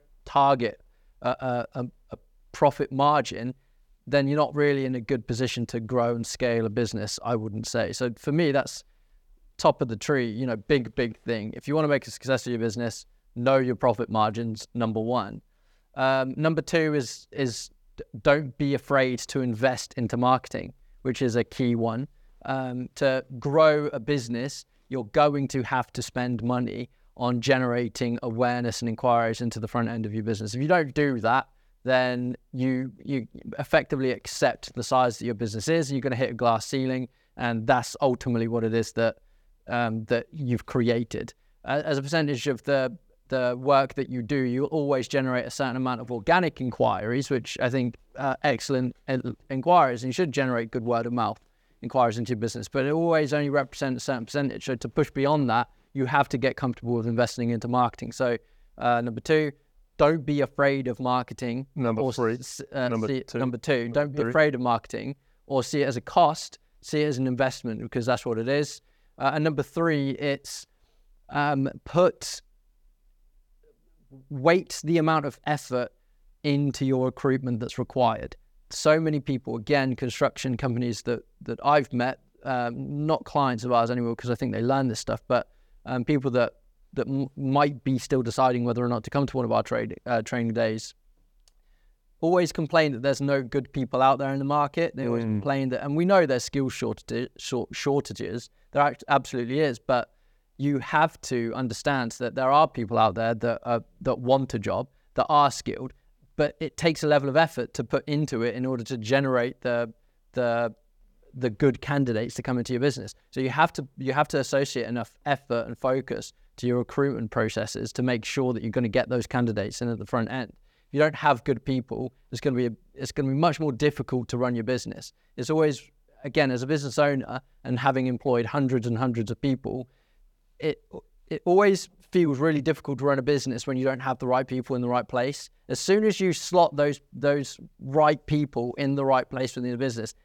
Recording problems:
none

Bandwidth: 18 kHz